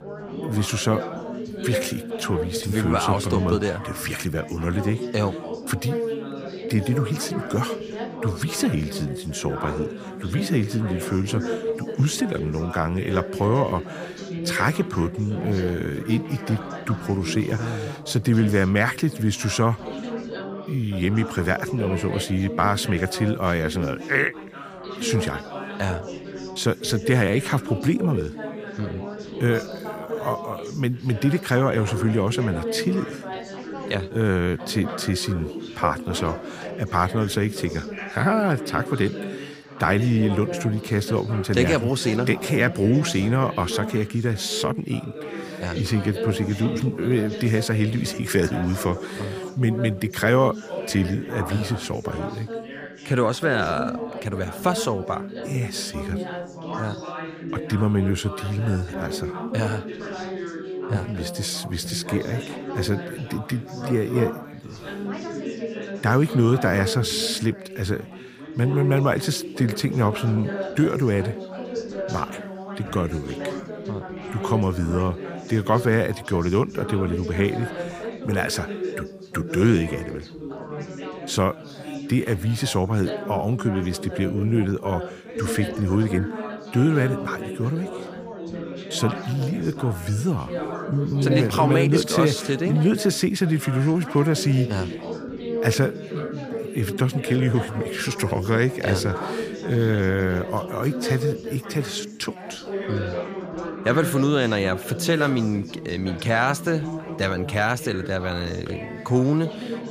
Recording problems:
background chatter; loud; throughout; 4 voices, 8 dB below the speech

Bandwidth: 15 kHz